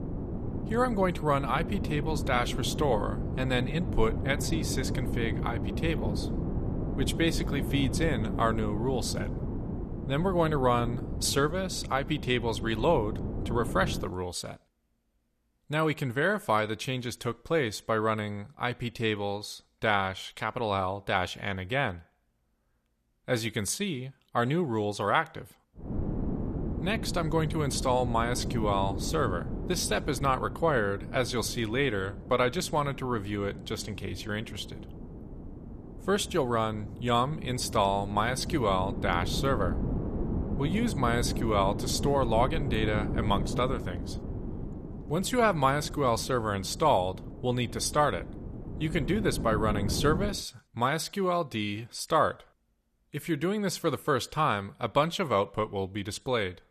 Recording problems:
wind noise on the microphone; occasional gusts; until 14 s and from 26 to 50 s; 15 dB below the speech

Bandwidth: 14 kHz